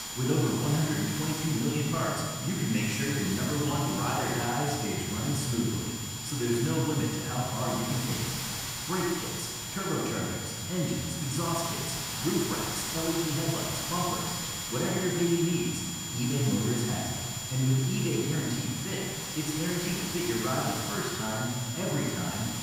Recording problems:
room echo; strong; dies away in 1.6 s
off-mic speech; far
high-pitched whine; loud; throughout; 7 kHz, 7 dB below the speech
hiss; loud; throughout; 6 dB below the speech

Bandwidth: 15.5 kHz